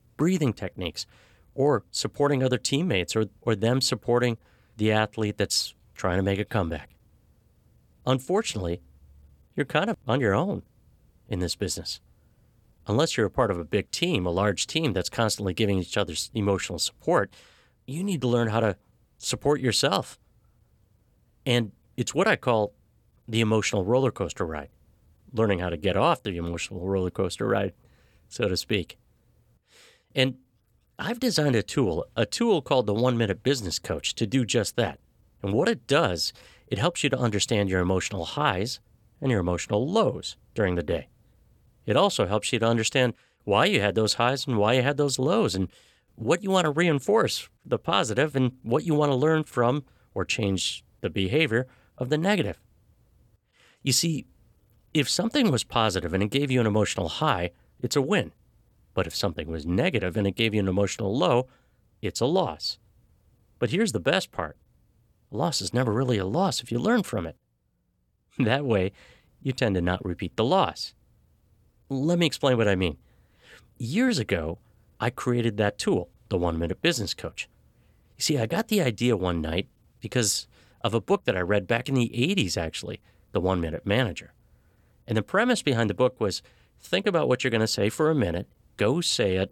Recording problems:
none

